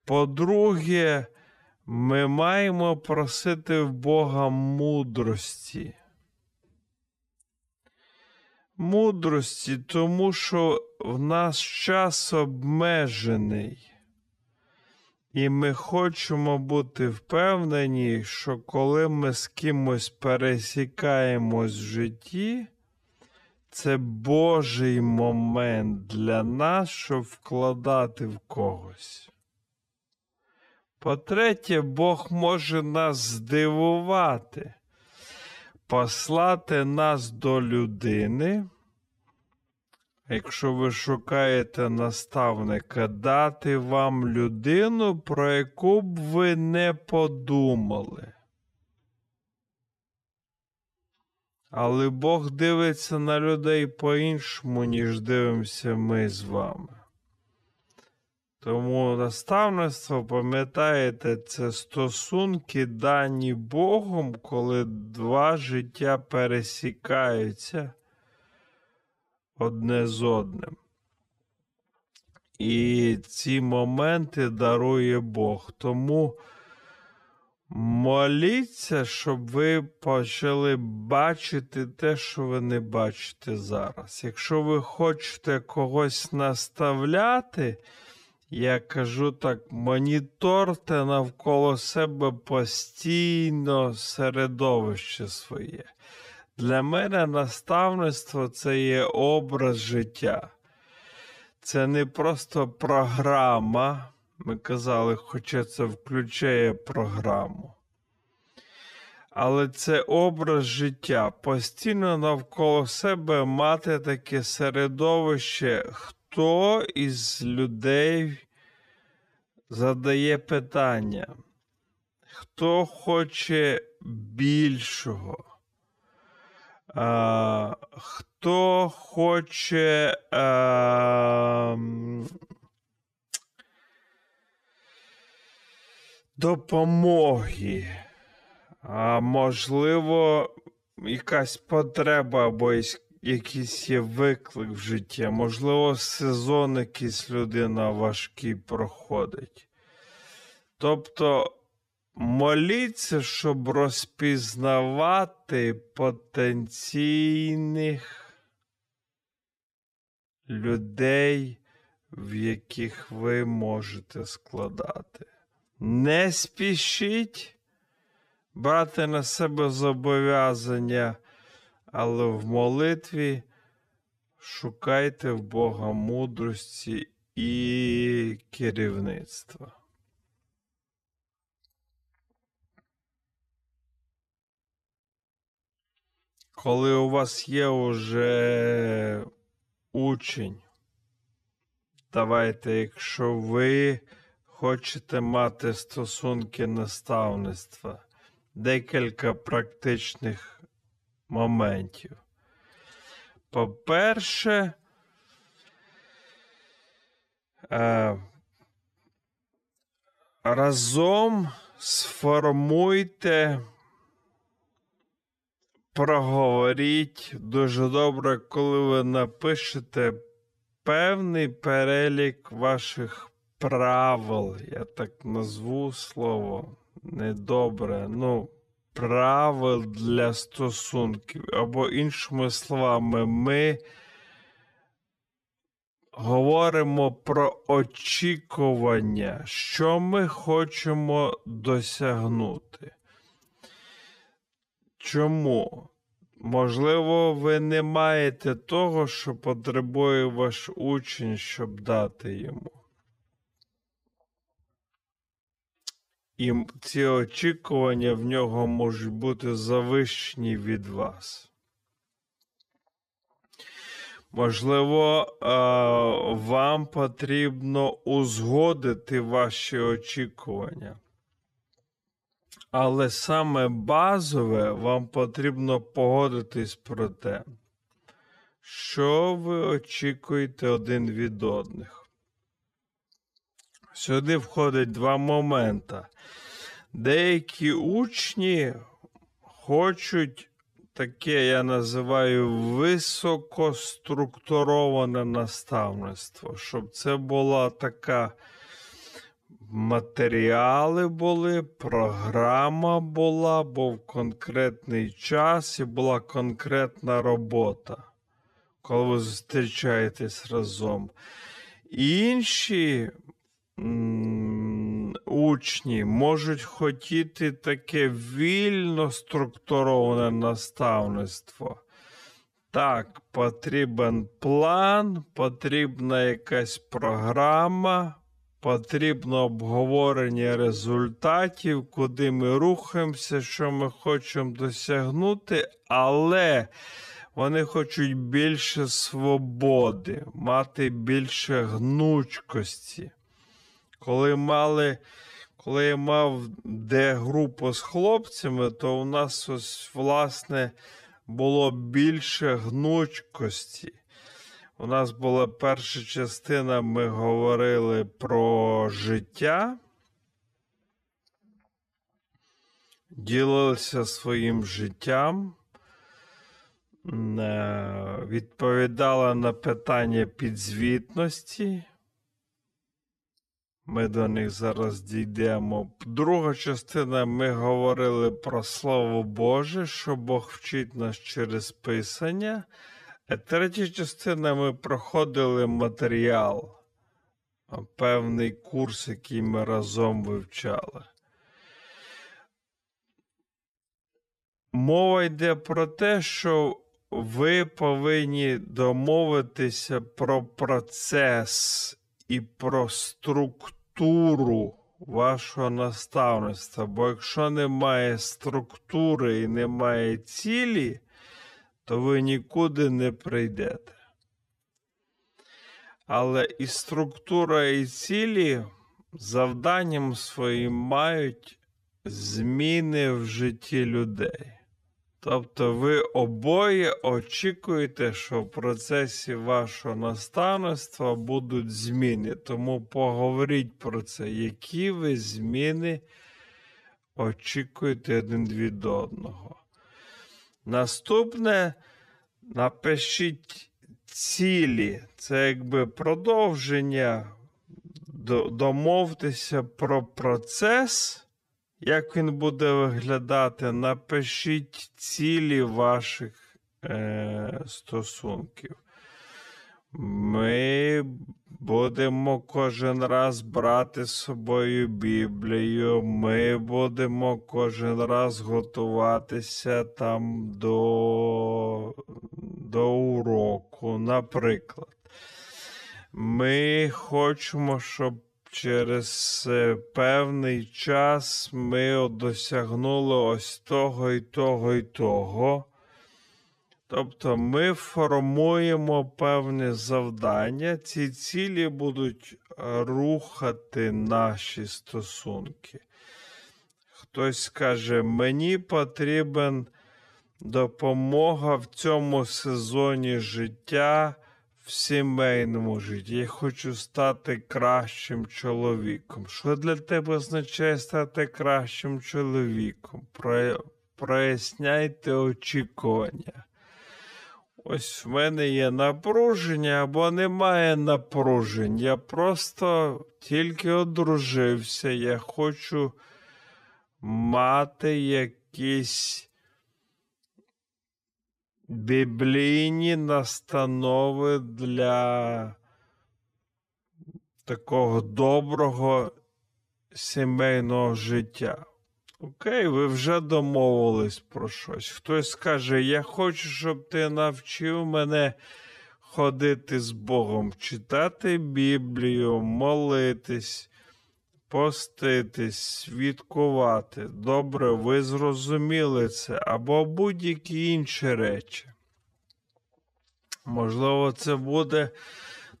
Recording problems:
wrong speed, natural pitch; too slow; 0.5 times normal speed

